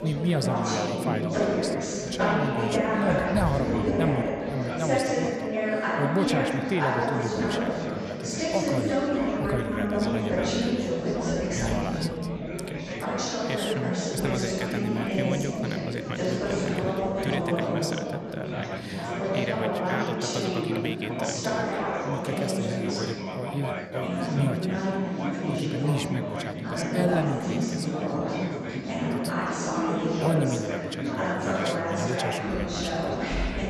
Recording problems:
chatter from many people; very loud; throughout; 5 dB above the speech

